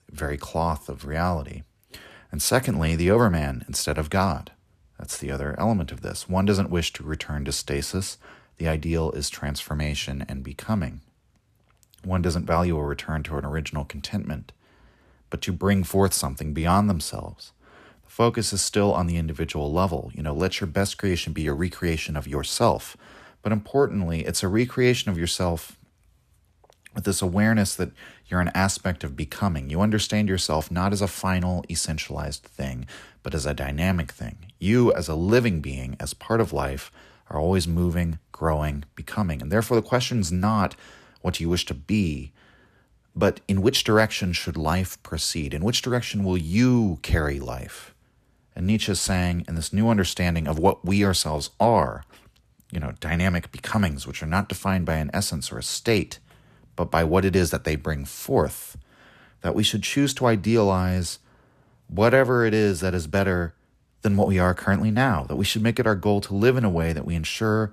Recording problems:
none

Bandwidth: 14.5 kHz